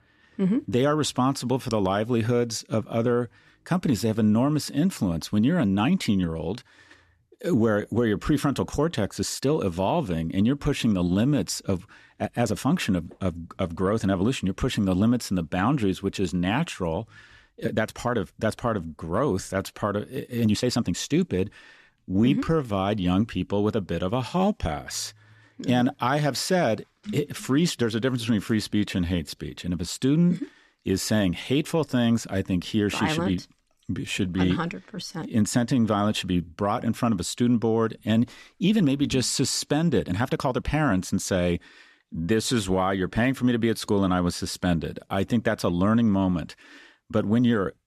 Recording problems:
uneven, jittery; strongly; from 5.5 to 41 s

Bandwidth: 13.5 kHz